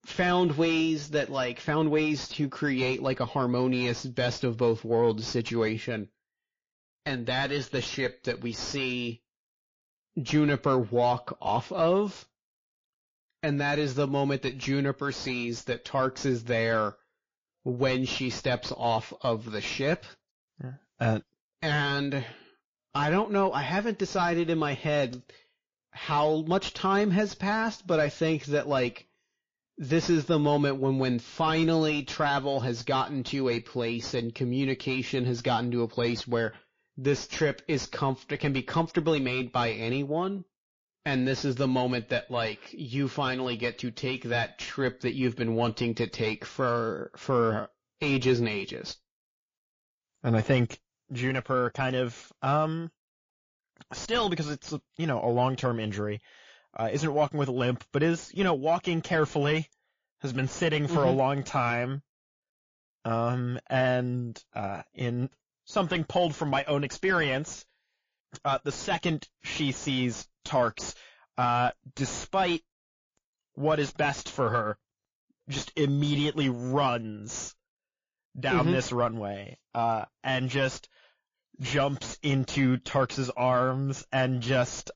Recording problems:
distortion; slight; 9 dB below the speech
garbled, watery; slightly; nothing above 6.5 kHz

